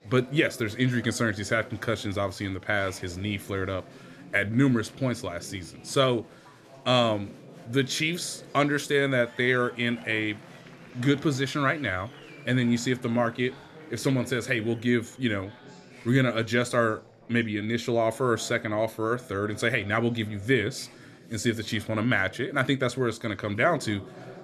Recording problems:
chatter from many people; faint; throughout; 20 dB below the speech

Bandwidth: 13.5 kHz